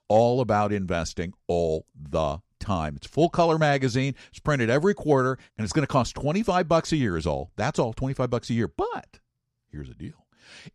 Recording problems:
none

